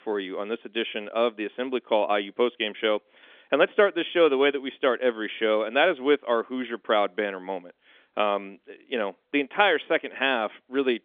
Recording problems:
phone-call audio; nothing above 3.5 kHz

